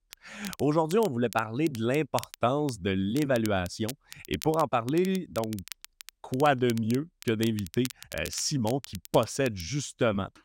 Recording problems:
crackle, like an old record; noticeable; 15 dB below the speech

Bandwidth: 16 kHz